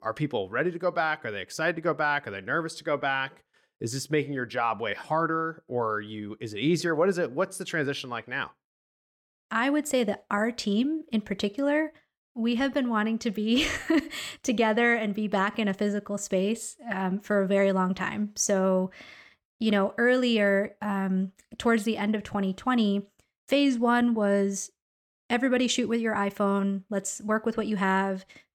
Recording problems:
none

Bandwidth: 18 kHz